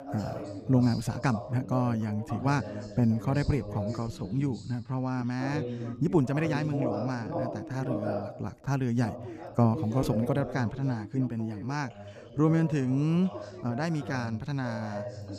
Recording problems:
background chatter; loud; throughout; 2 voices, 9 dB below the speech
uneven, jittery; strongly; from 0.5 to 15 s

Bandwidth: 14.5 kHz